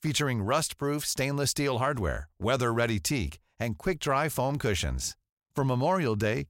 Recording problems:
none

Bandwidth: 16 kHz